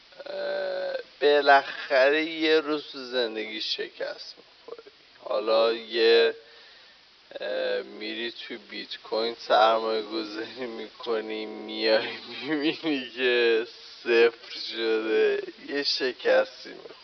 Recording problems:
thin; very; fading below 350 Hz
wrong speed, natural pitch; too slow; 0.5 times normal speed
high frequencies cut off; noticeable; nothing above 5.5 kHz
hiss; faint; throughout; 25 dB below the speech

